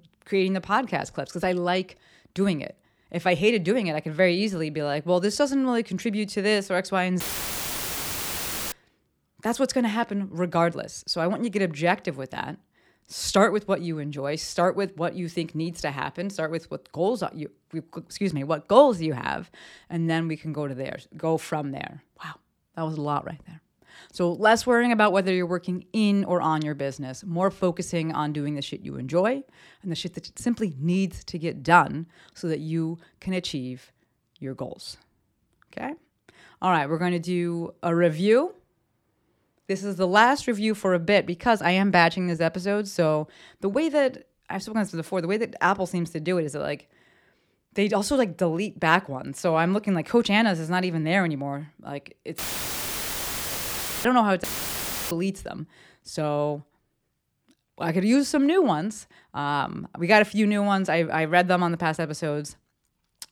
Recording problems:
audio cutting out; filled with static; at 7 s for 1.5 s, at 52 s for 1.5 s and at 54 s for 0.5 s

